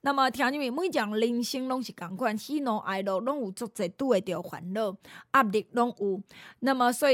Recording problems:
abrupt cut into speech; at the end

